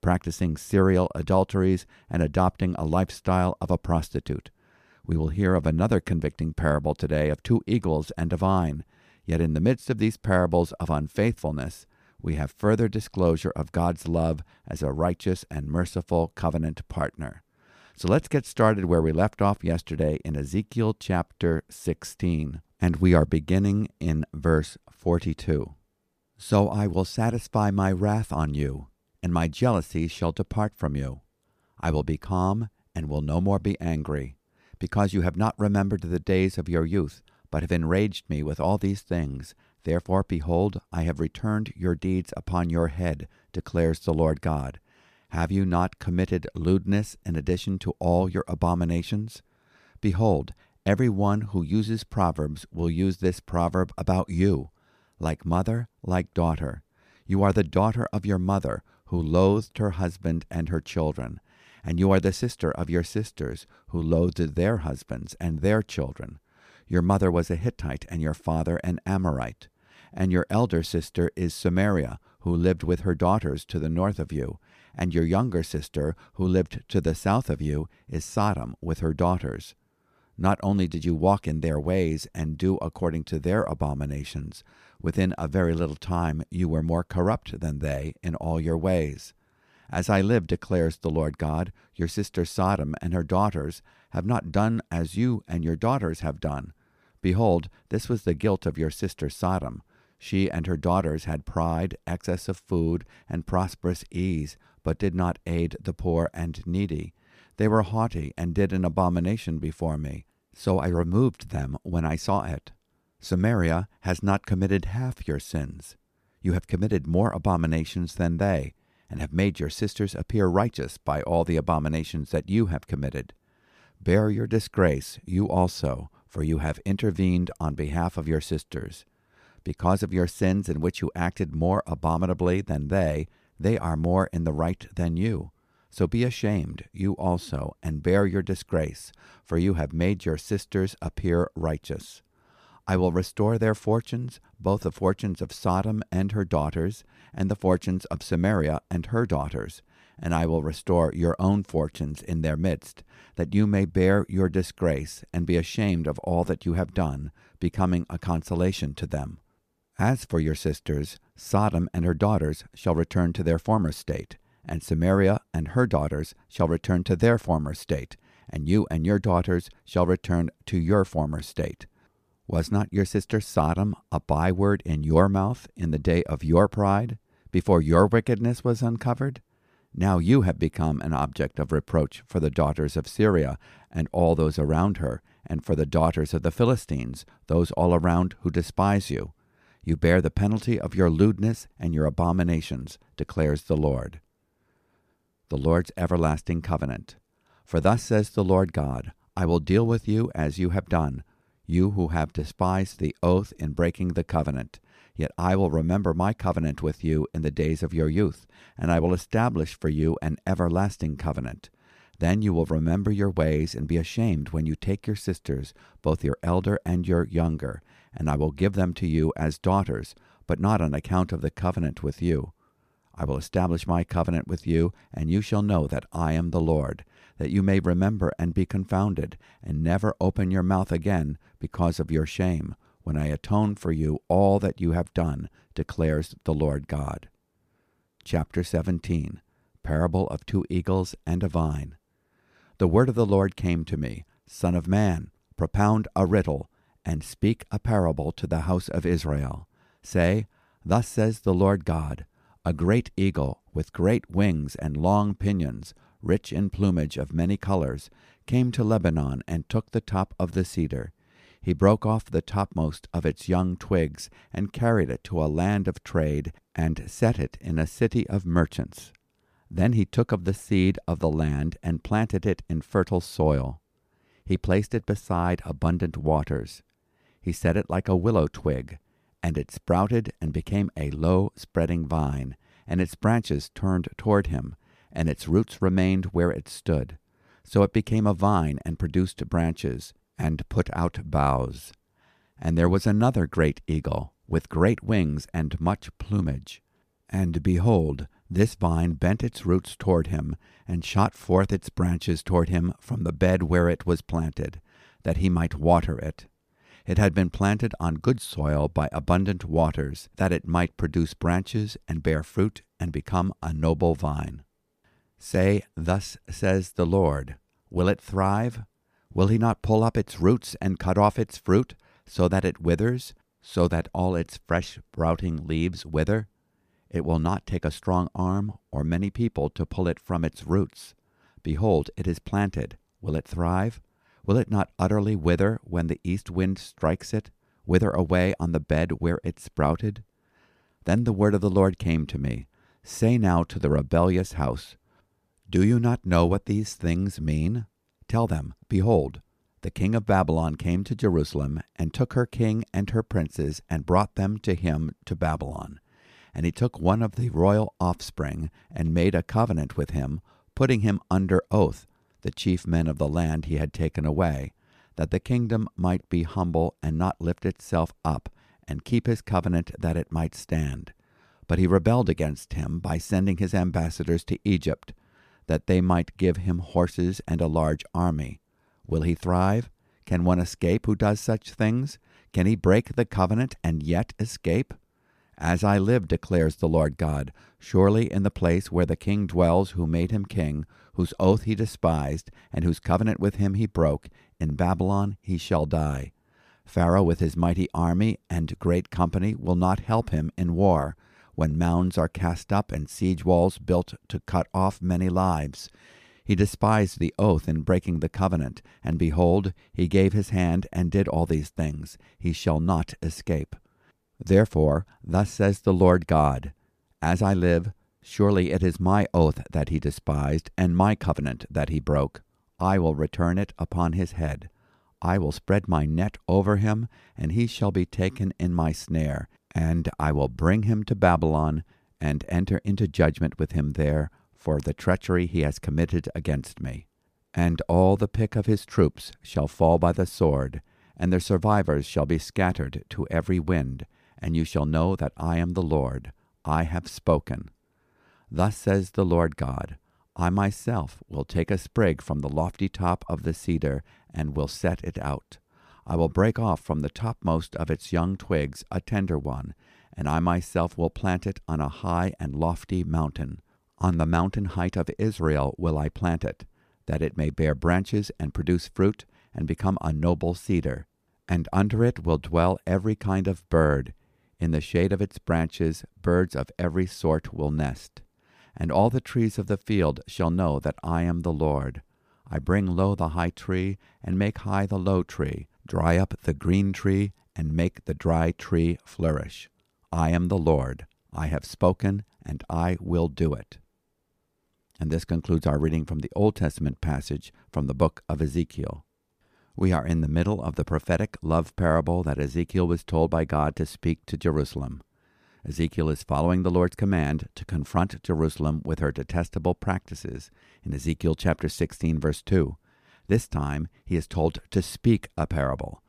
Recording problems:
none

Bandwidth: 14.5 kHz